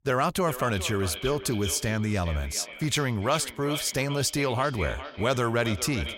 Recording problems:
echo of what is said; strong; throughout; 400 ms later, 10 dB below the speech

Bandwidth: 16 kHz